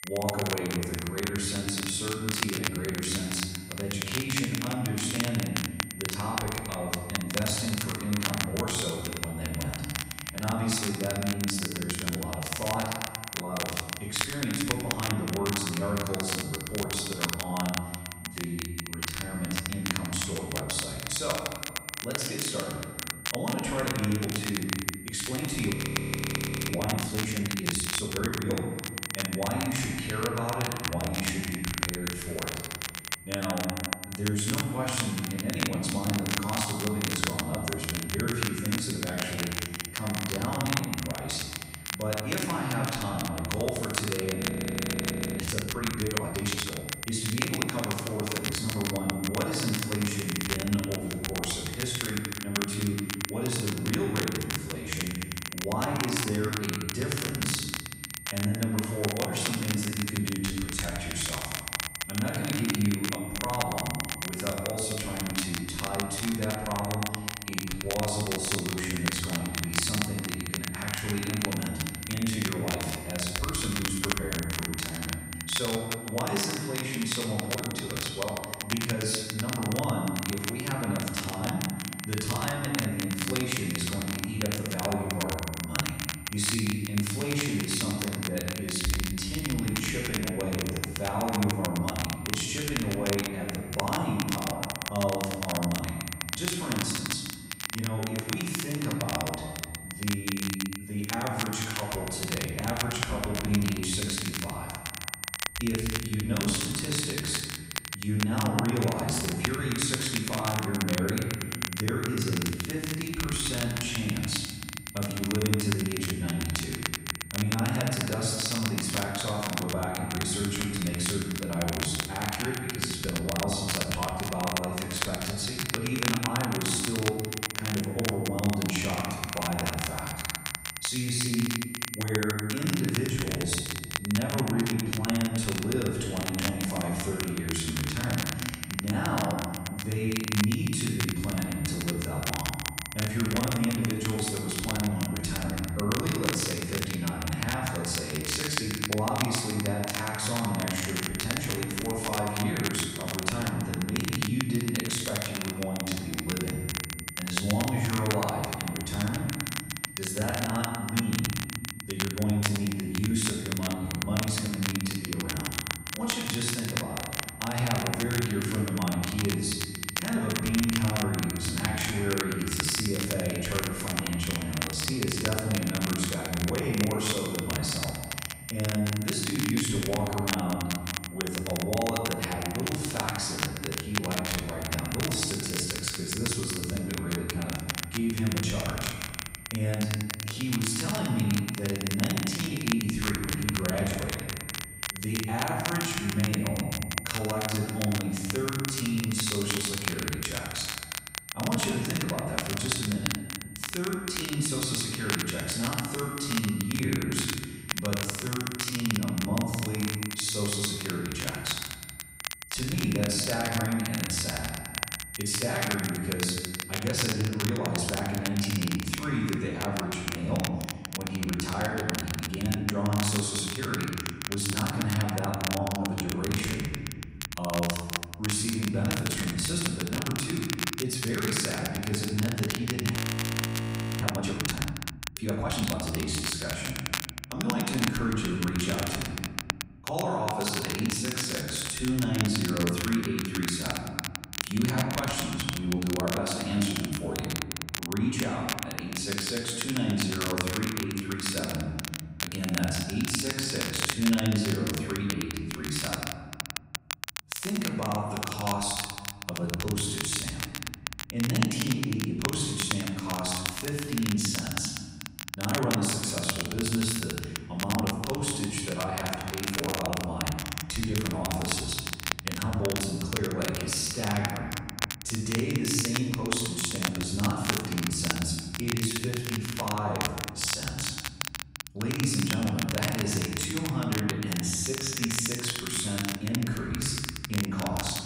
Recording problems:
off-mic speech; far
room echo; noticeable; dies away in 1.7 s
crackle, like an old record; loud; 4 dB below the speech
high-pitched whine; noticeable; until 3:37; 2 kHz, 15 dB below the speech
audio freezing; at 26 s for 1 s, at 44 s for 1 s and at 3:53 for 1 s

